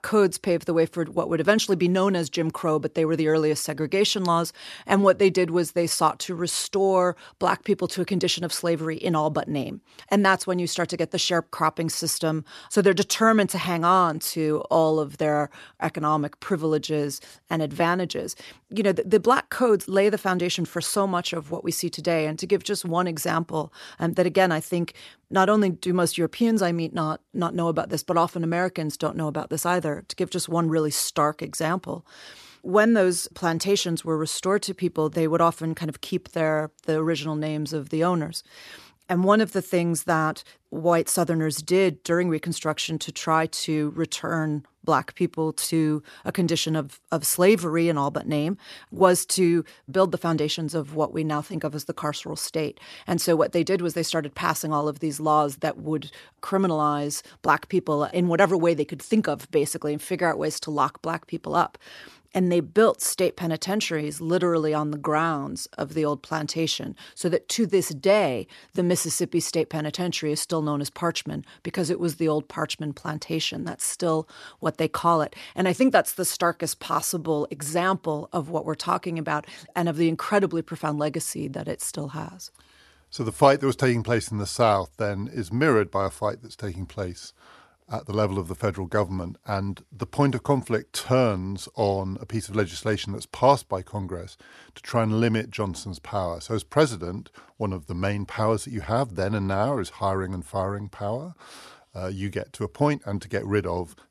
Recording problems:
none

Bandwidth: 13.5 kHz